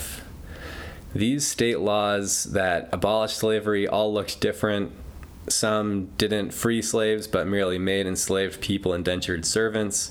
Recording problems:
squashed, flat; somewhat

